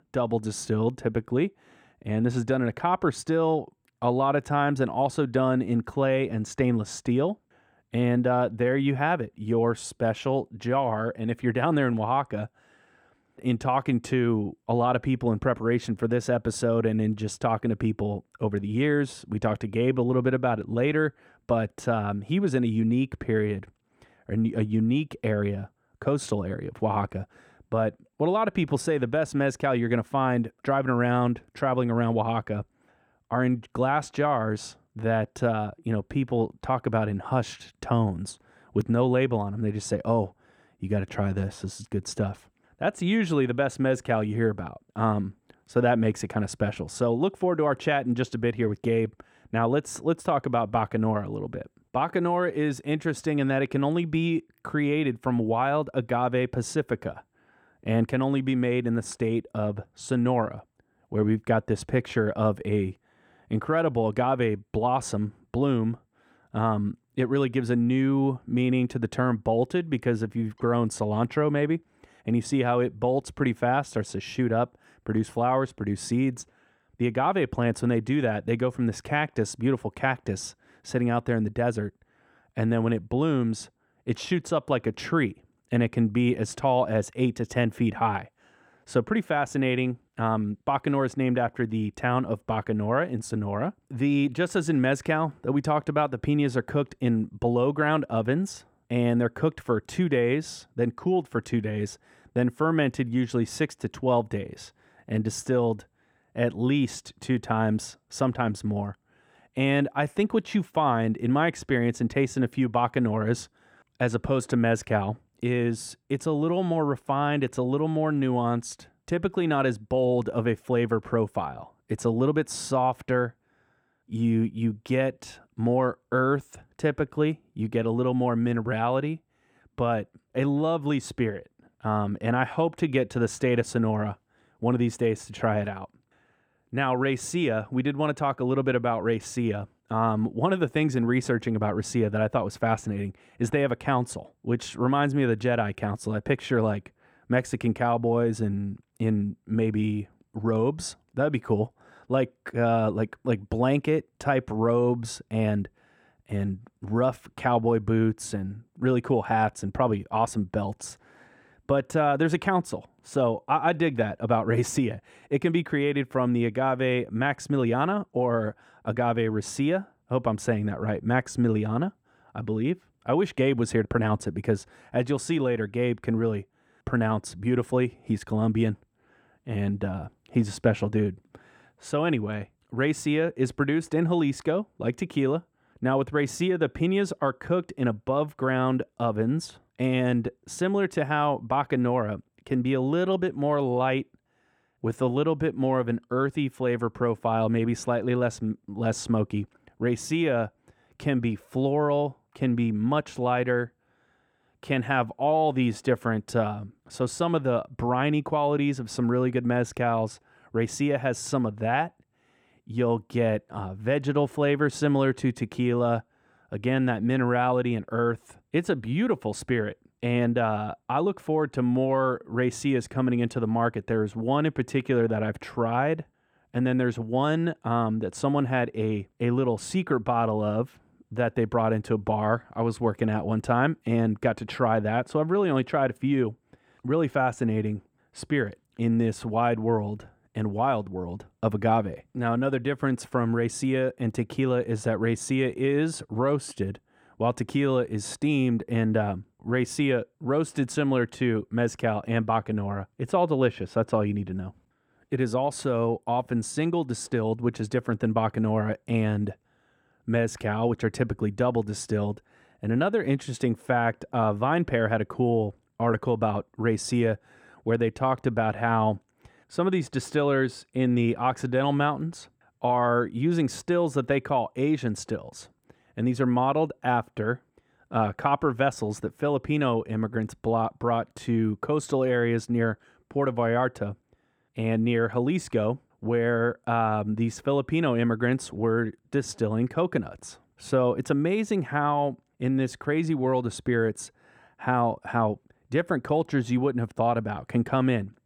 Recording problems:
muffled; slightly; fading above 3.5 kHz

